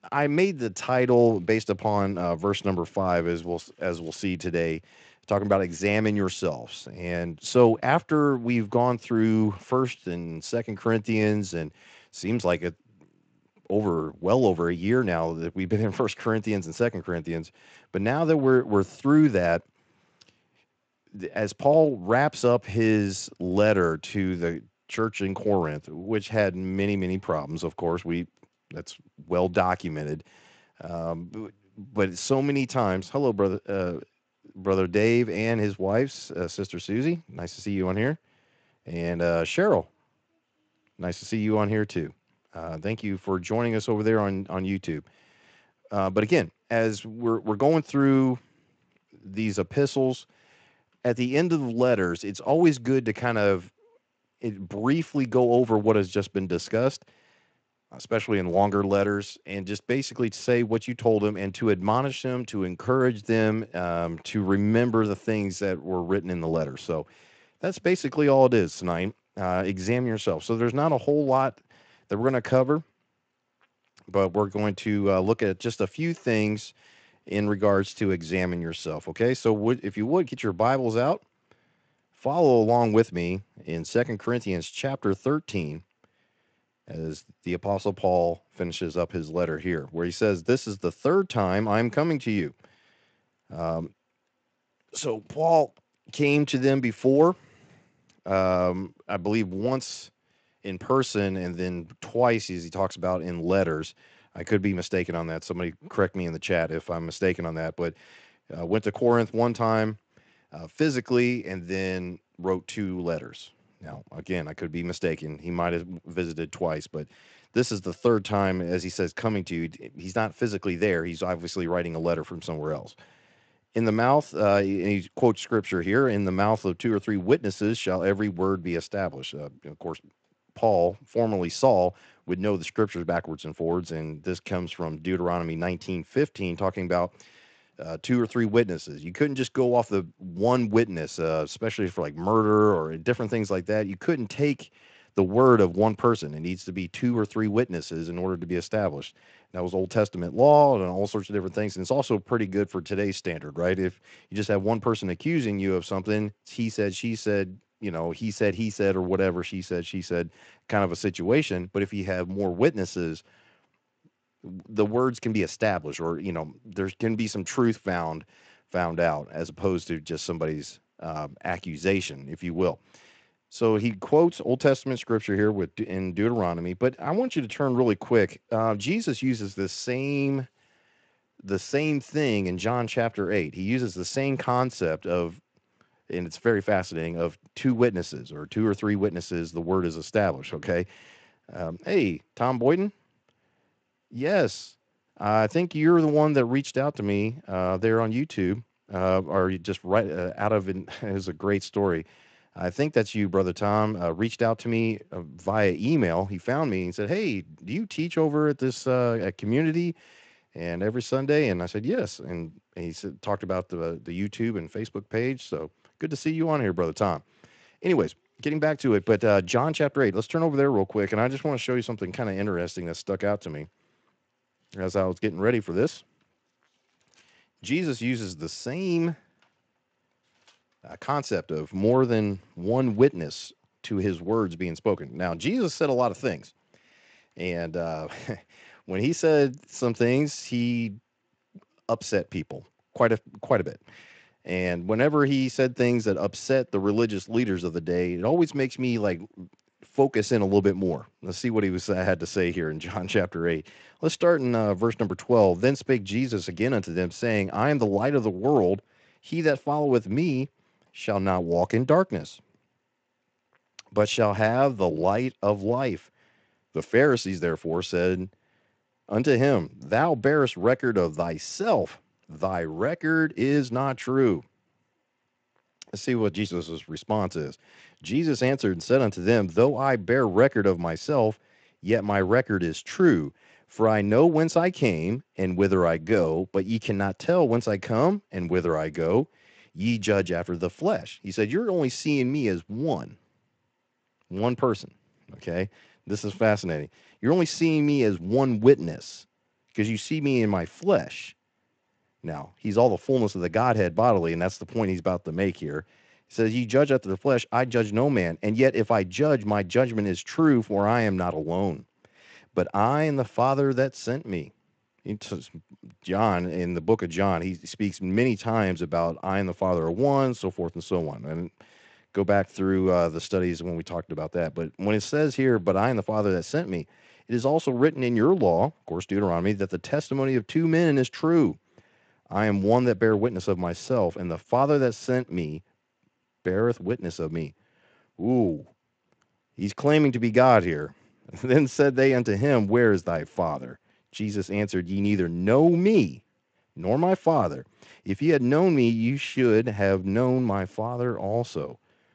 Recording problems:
garbled, watery; slightly; nothing above 8 kHz

